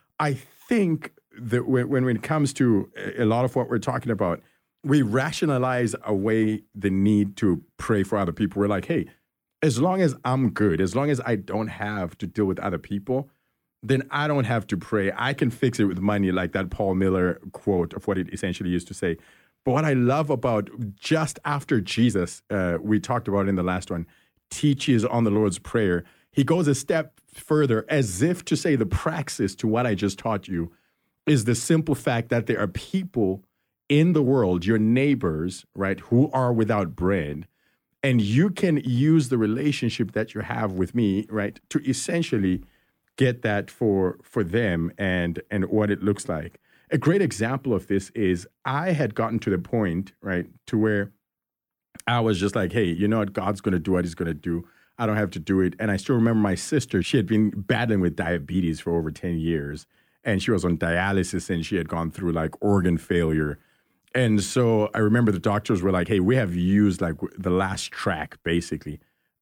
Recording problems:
uneven, jittery; strongly; from 18 s to 1:06

